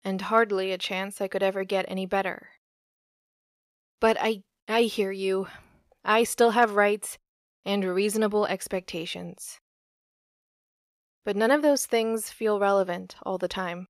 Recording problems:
none

